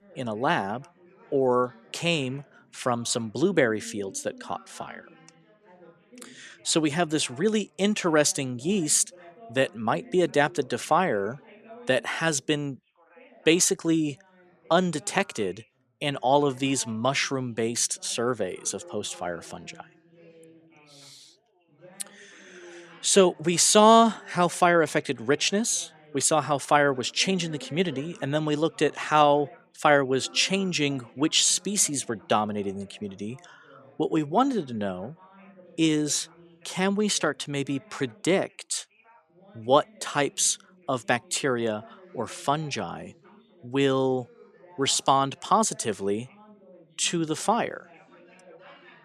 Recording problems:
background chatter; faint; throughout; 3 voices, 25 dB below the speech

